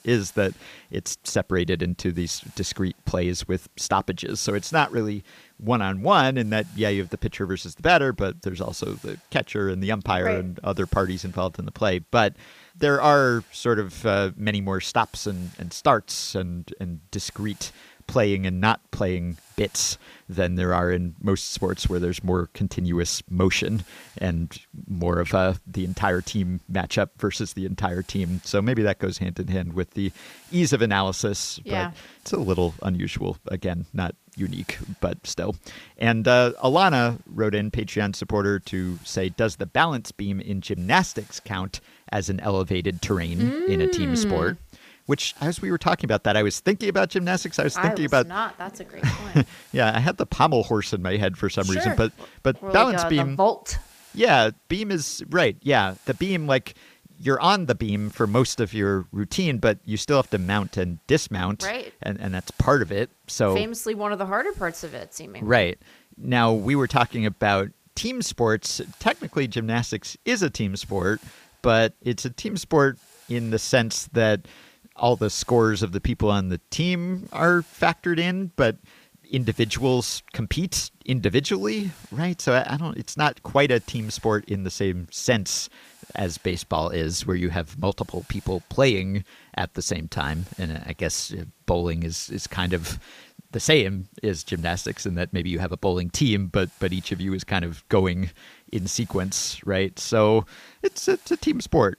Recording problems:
hiss; faint; throughout; 30 dB below the speech

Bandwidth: 15 kHz